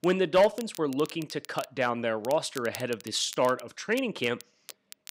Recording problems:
crackle, like an old record; noticeable; 20 dB below the speech

